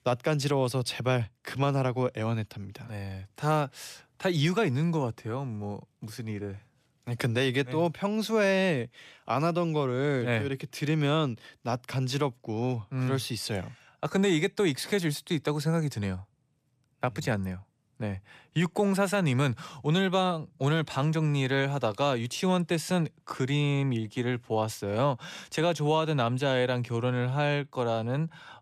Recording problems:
none

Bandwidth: 14.5 kHz